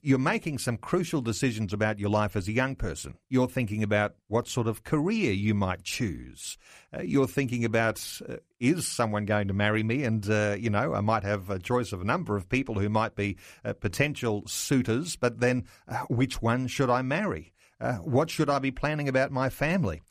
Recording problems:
none

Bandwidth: 14.5 kHz